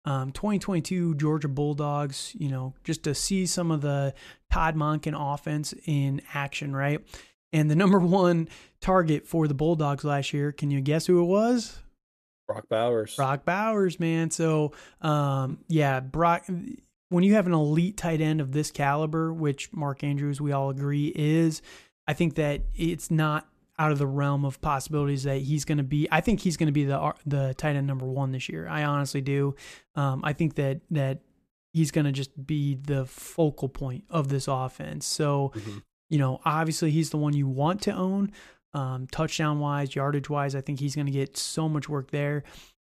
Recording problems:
none

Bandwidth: 14.5 kHz